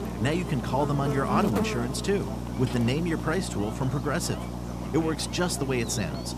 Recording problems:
electrical hum; loud; throughout; 60 Hz, 6 dB below the speech
voice in the background; faint; throughout; 20 dB below the speech

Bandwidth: 14.5 kHz